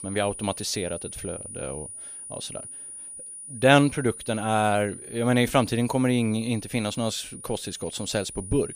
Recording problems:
high-pitched whine; noticeable; throughout; 9.5 kHz, 10 dB below the speech

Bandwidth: 15 kHz